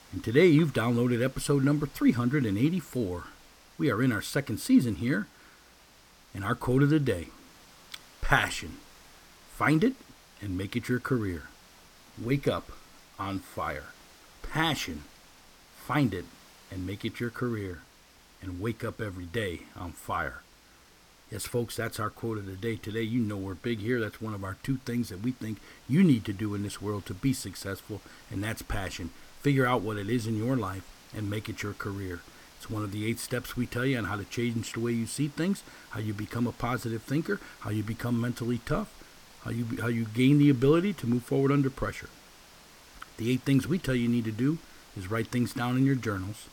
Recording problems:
hiss; faint; throughout; 25 dB below the speech

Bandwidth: 17 kHz